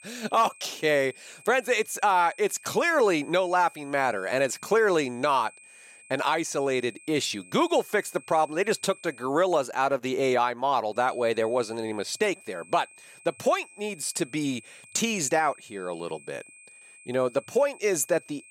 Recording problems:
high-pitched whine; faint; until 9.5 s and from 11 s on; 2.5 kHz, 25 dB below the speech

